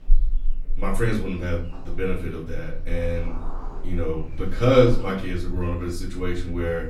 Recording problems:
off-mic speech; far
room echo; slight; dies away in 0.4 s
animal sounds; loud; throughout; 10 dB below the speech

